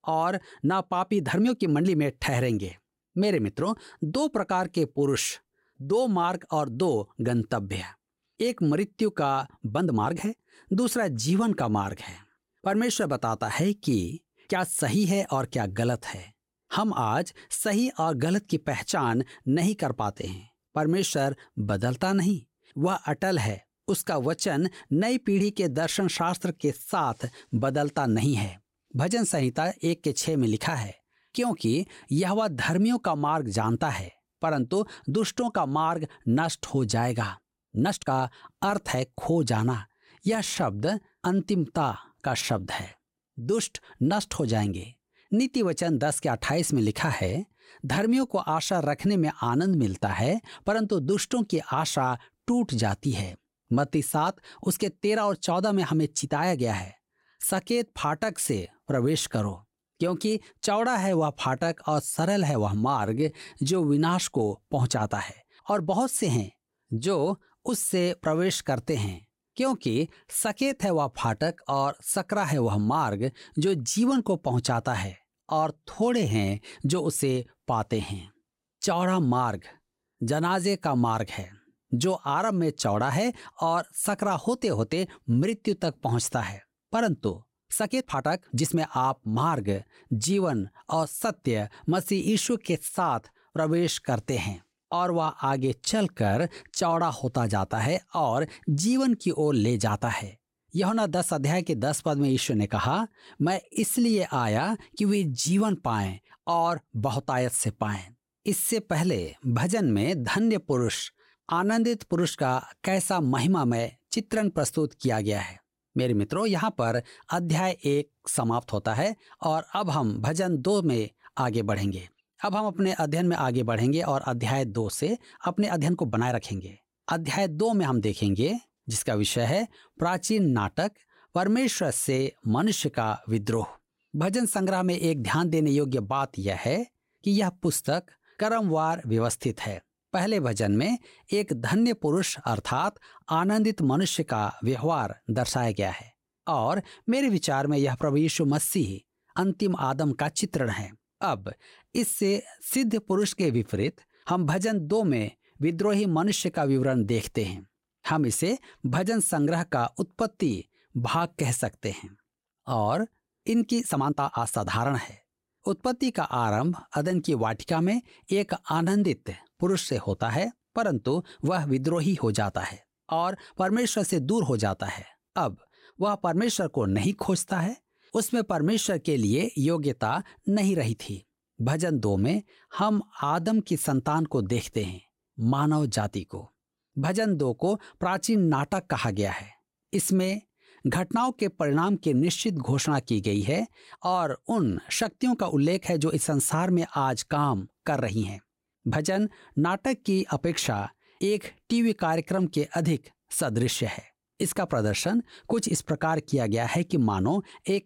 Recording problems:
uneven, jittery; strongly; from 1 s to 3:03

